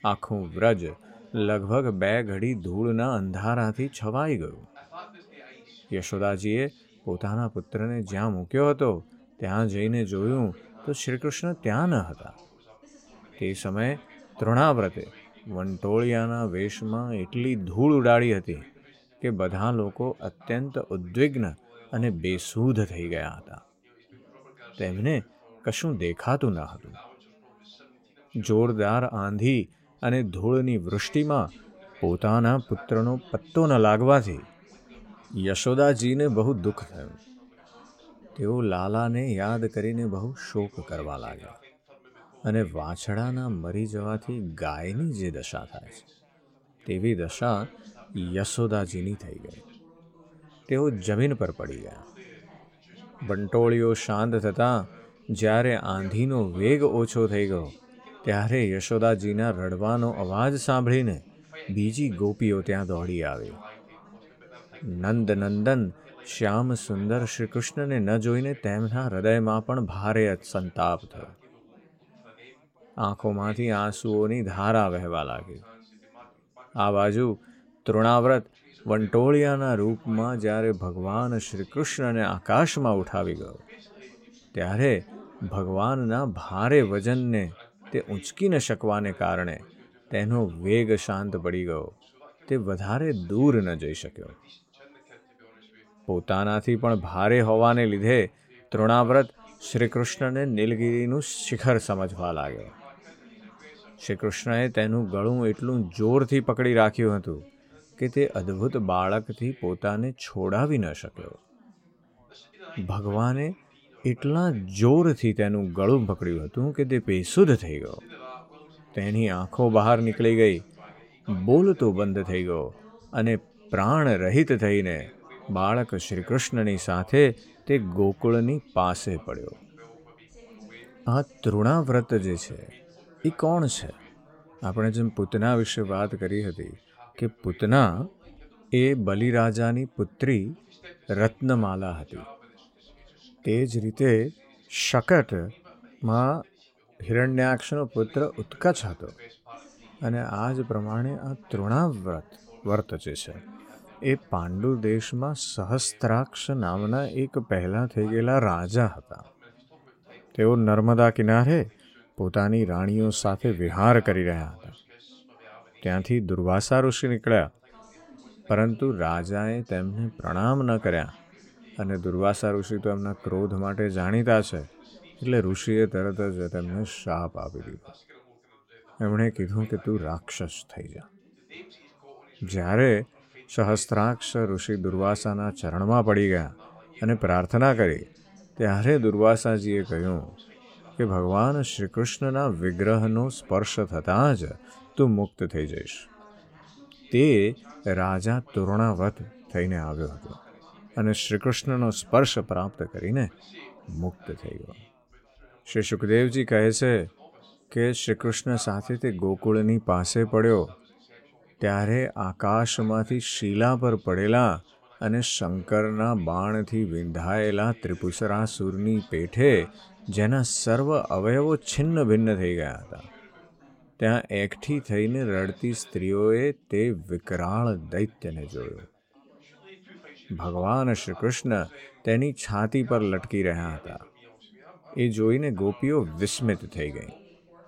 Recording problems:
background chatter; faint; throughout; 4 voices, 25 dB below the speech

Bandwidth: 16 kHz